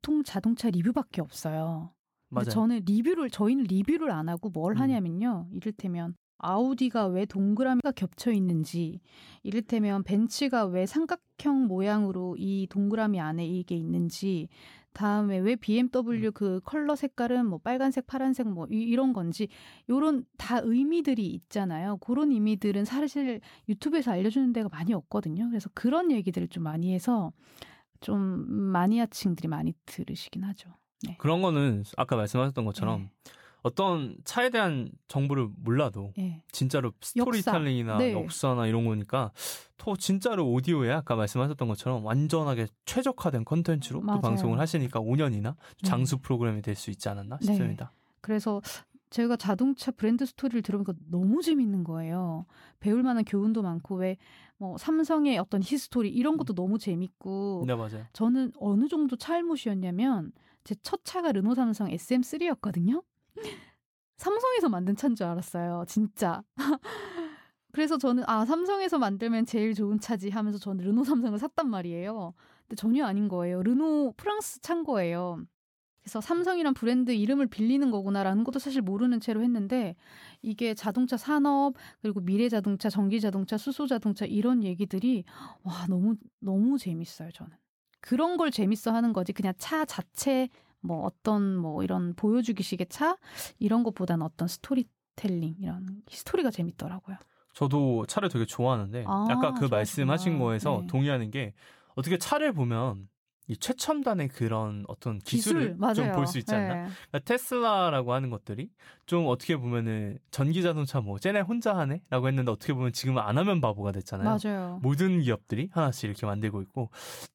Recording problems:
none

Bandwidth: 18 kHz